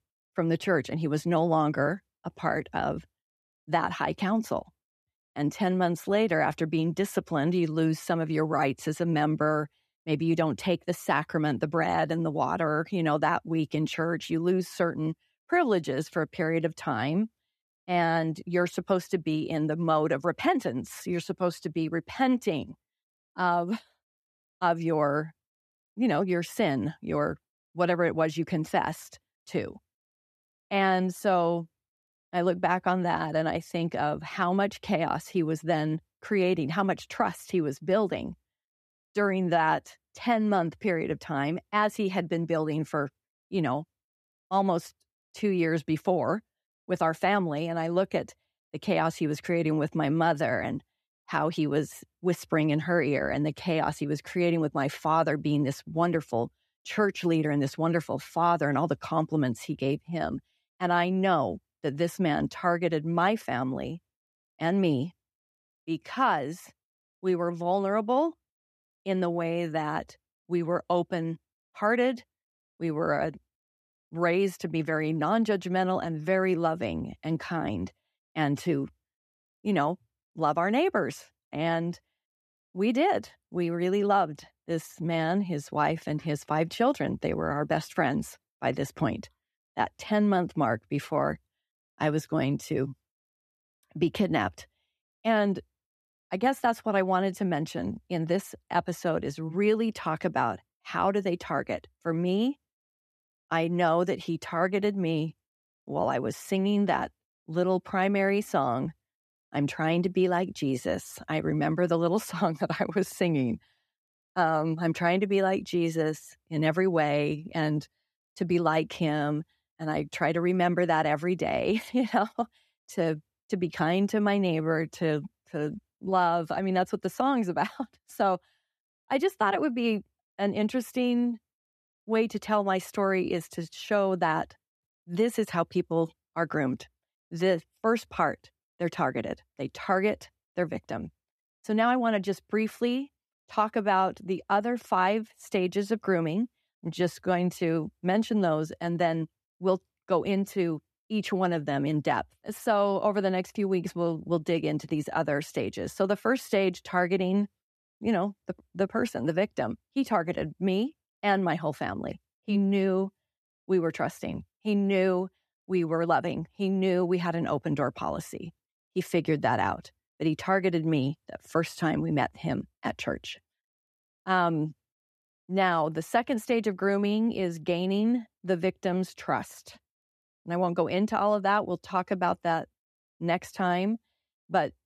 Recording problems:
none

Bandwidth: 13.5 kHz